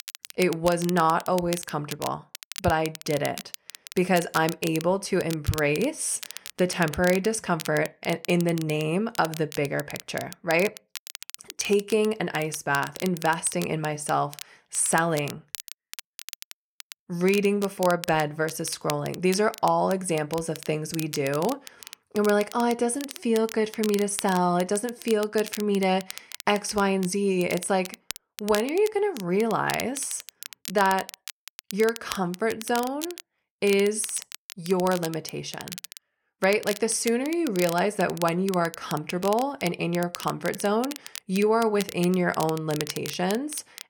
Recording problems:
crackle, like an old record; noticeable; 15 dB below the speech

